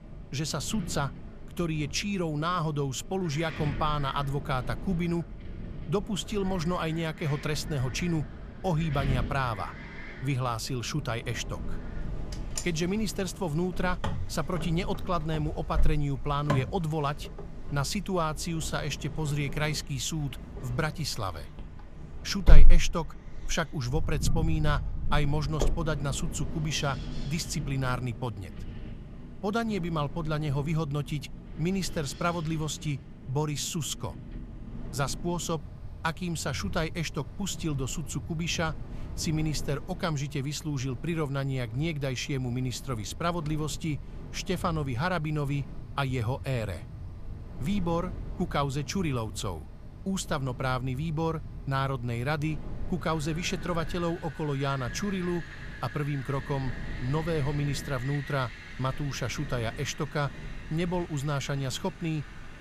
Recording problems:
wind in the background; loud; throughout; 7 dB below the speech

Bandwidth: 14.5 kHz